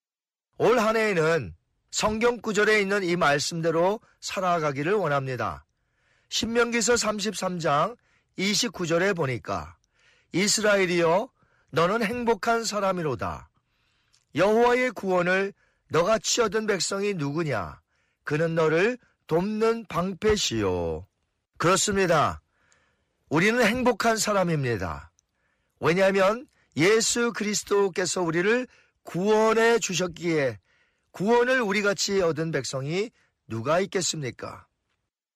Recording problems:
distortion; slight; 10 dB below the speech

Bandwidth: 15 kHz